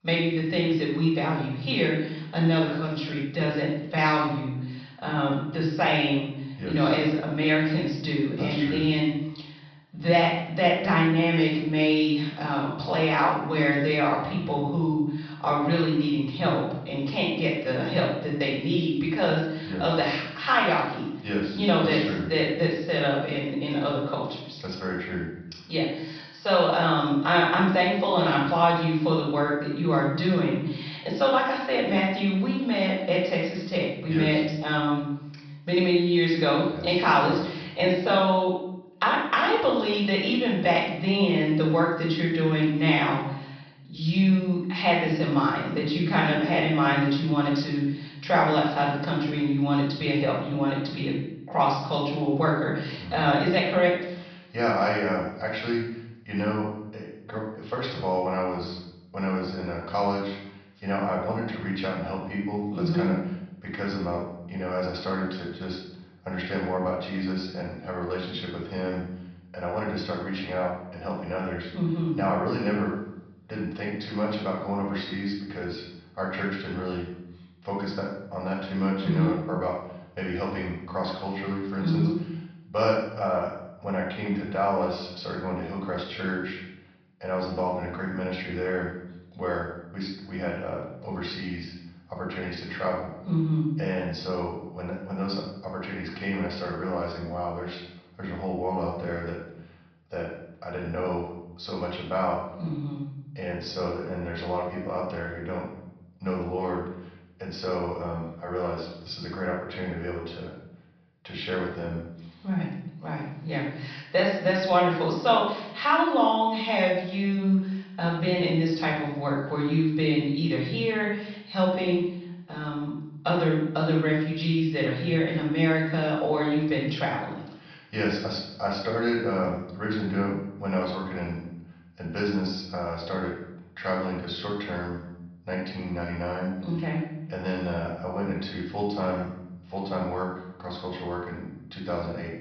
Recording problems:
off-mic speech; far
room echo; noticeable; dies away in 0.7 s
high frequencies cut off; noticeable; nothing above 5.5 kHz

